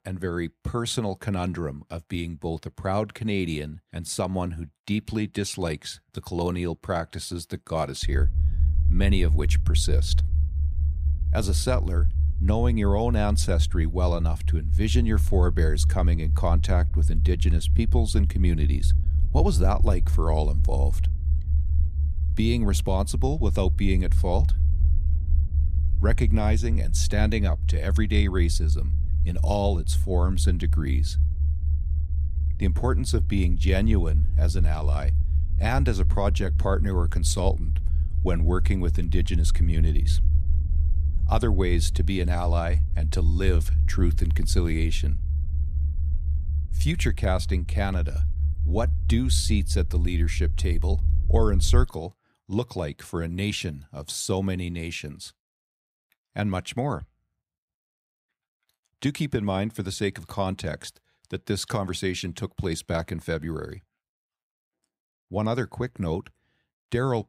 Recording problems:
low rumble; noticeable; from 8 to 52 s; 15 dB below the speech

